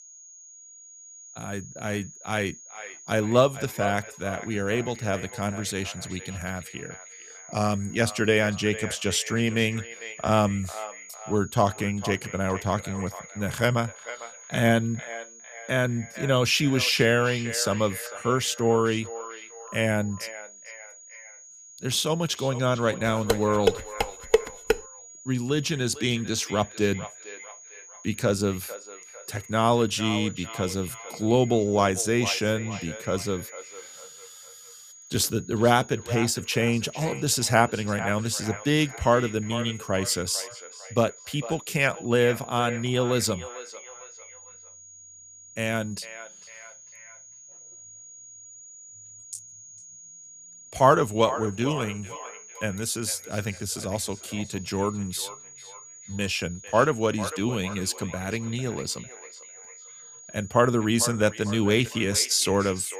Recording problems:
echo of what is said; noticeable; throughout; 450 ms later, 15 dB below the speech
high-pitched whine; noticeable; throughout; 6.5 kHz, 20 dB below the speech
clattering dishes; loud; from 23 to 25 s; peak 1 dB above the speech

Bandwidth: 15 kHz